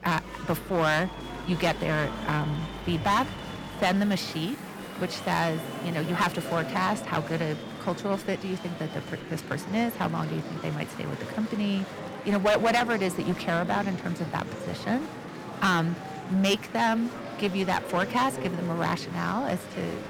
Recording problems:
distortion; slight; 5% of the sound clipped
murmuring crowd; loud; throughout; 9 dB below the speech
household noises; noticeable; until 6.5 s; 20 dB below the speech

